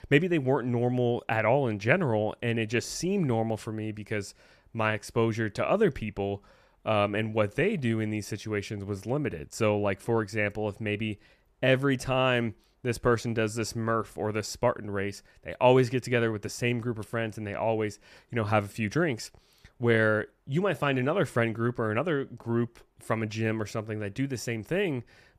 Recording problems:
none

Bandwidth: 14.5 kHz